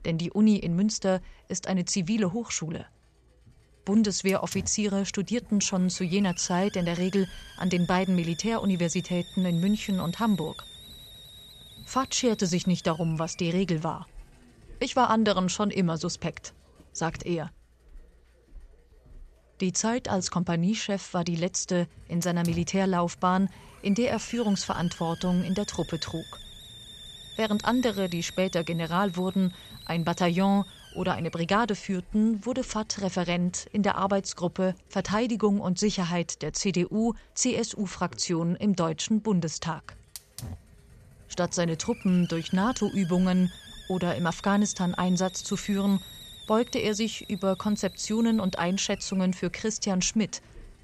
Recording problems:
high frequencies cut off; noticeable; nothing above 8 kHz
hiss; noticeable; throughout; 20 dB below the speech

